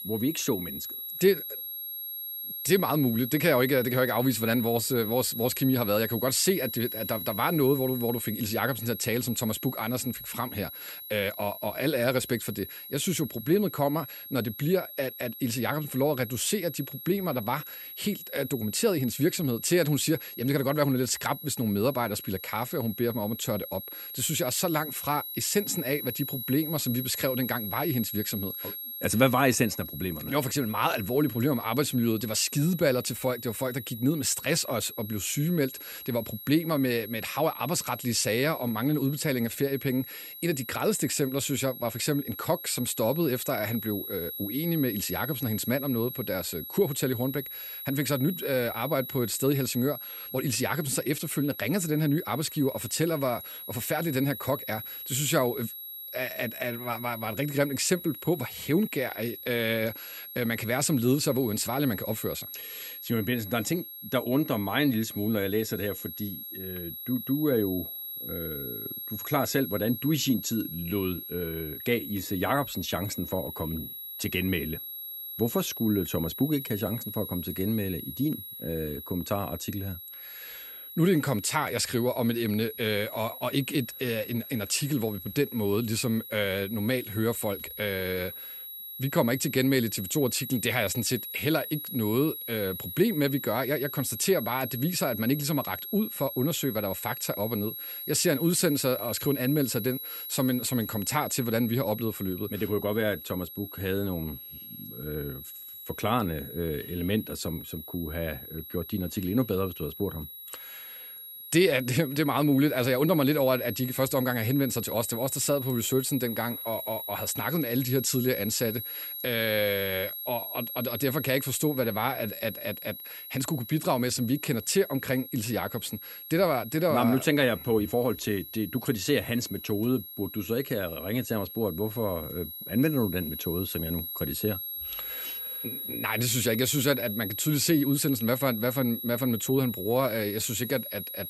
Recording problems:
high-pitched whine; loud; throughout; 11.5 kHz, 8 dB below the speech

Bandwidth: 15 kHz